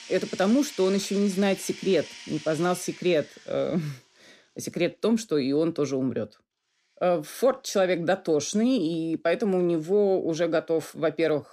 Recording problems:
household noises; noticeable; throughout; 15 dB below the speech

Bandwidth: 15 kHz